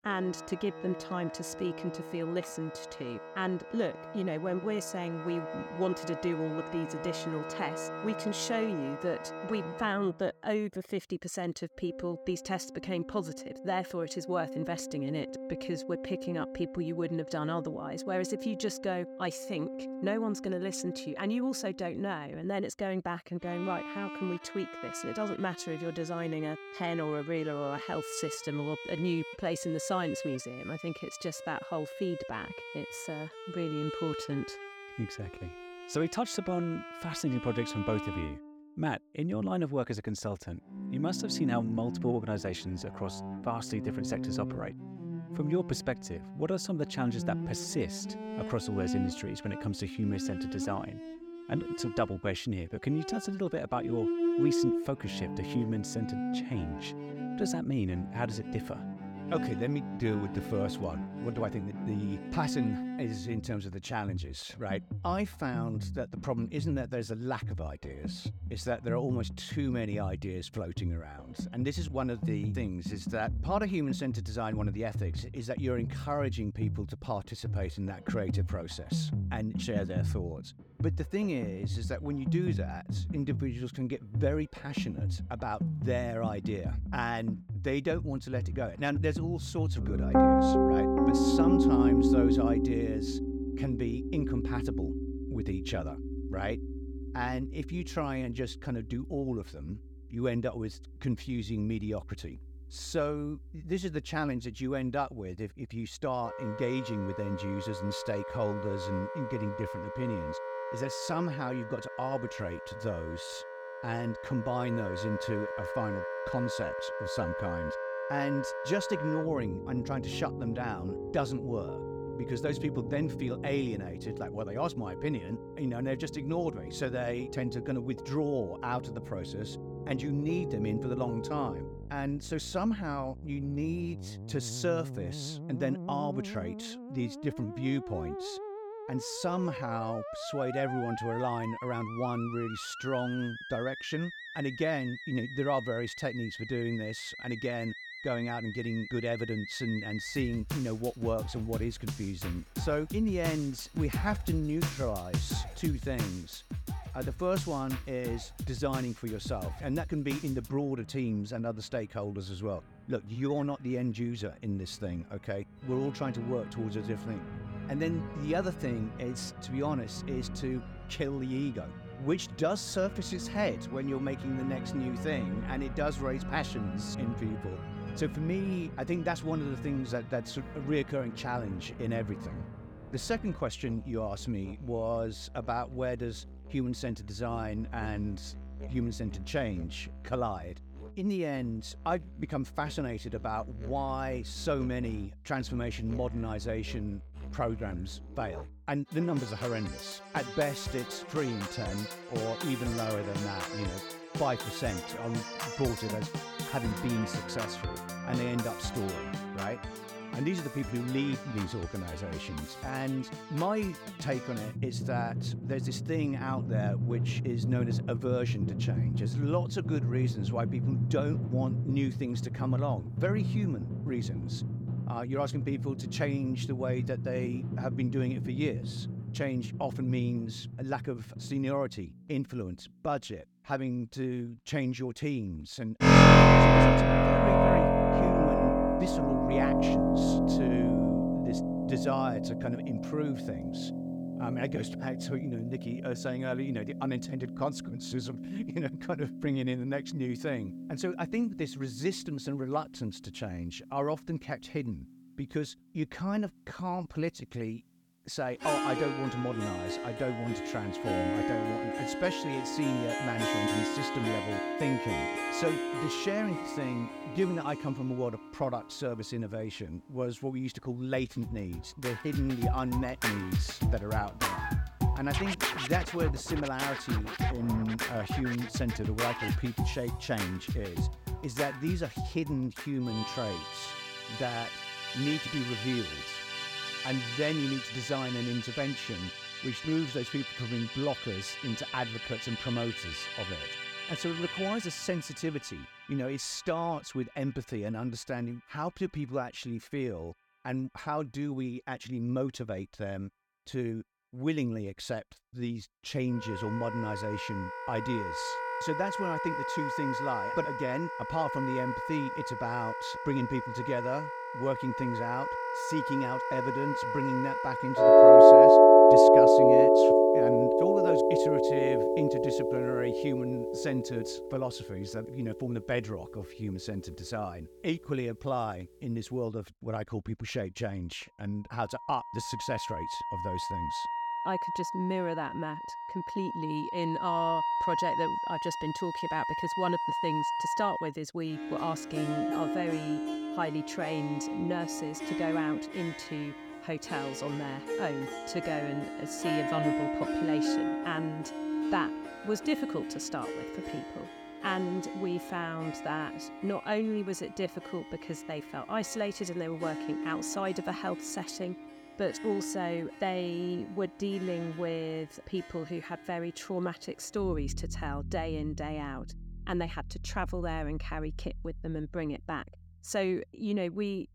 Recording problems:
background music; very loud; throughout; 4 dB above the speech

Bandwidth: 18 kHz